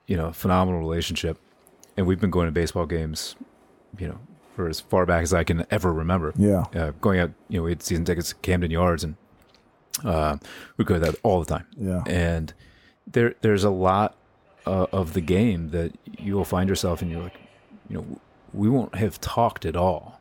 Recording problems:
train or aircraft noise; faint; throughout; 30 dB below the speech

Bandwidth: 17 kHz